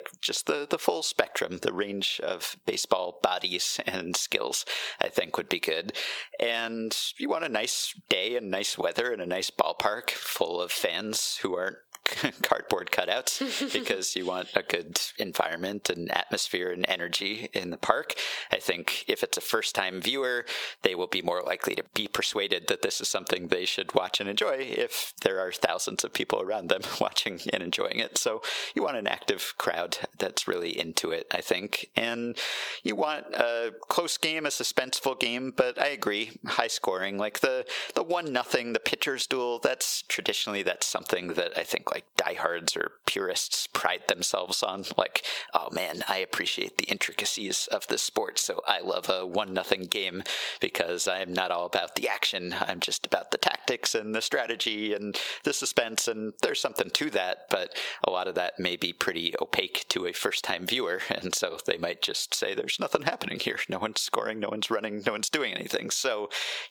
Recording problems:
squashed, flat; heavily
thin; somewhat; fading below 500 Hz

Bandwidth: 19 kHz